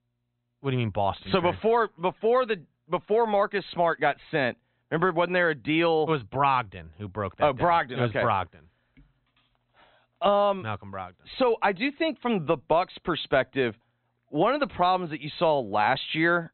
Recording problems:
high frequencies cut off; severe; nothing above 4 kHz

